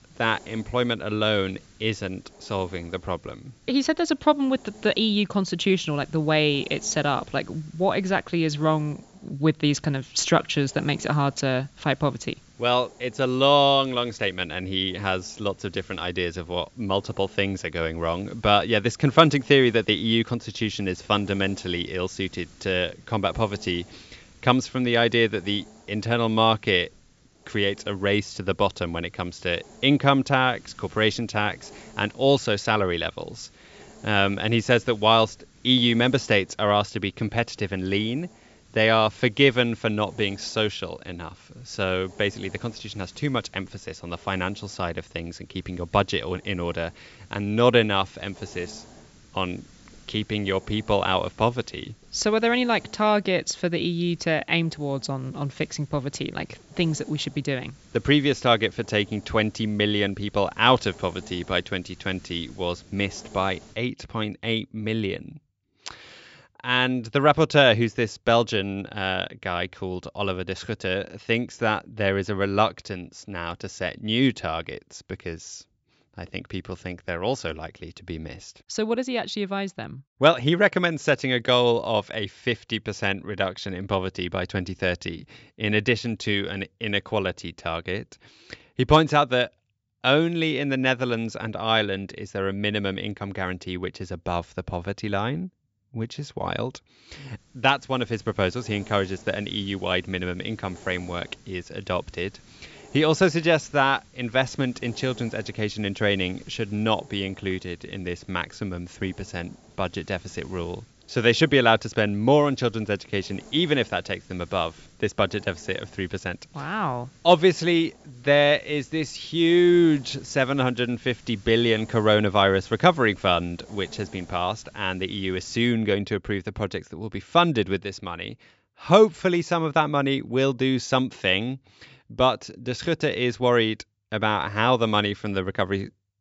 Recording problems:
high frequencies cut off; noticeable; nothing above 7.5 kHz
hiss; faint; until 1:04 and from 1:37 to 2:06; 25 dB below the speech

